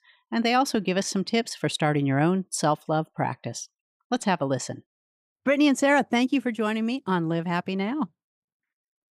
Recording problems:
none

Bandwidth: 15 kHz